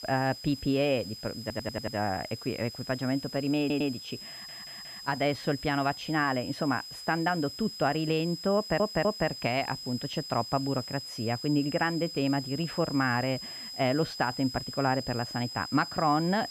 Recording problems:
muffled; slightly; fading above 3.5 kHz
high-pitched whine; loud; throughout; 5 kHz, 9 dB below the speech
hiss; faint; throughout; 25 dB below the speech
audio stuttering; 4 times, first at 1.5 s

